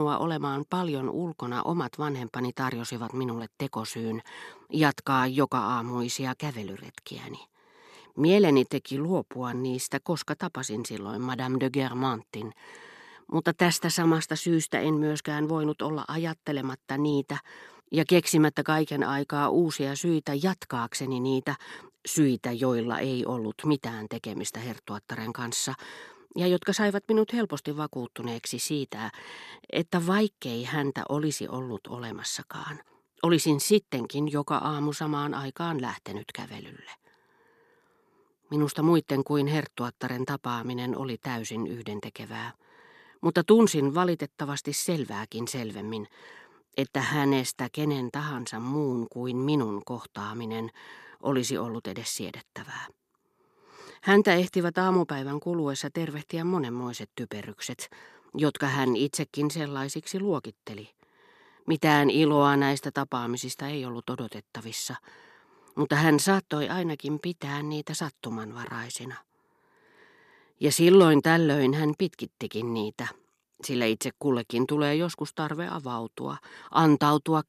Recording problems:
abrupt cut into speech; at the start

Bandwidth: 13.5 kHz